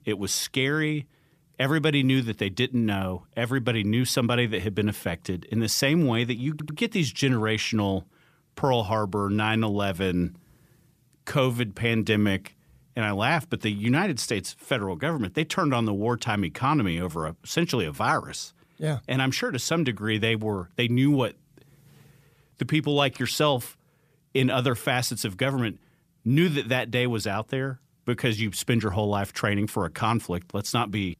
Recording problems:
audio stuttering; at 6.5 s

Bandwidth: 14.5 kHz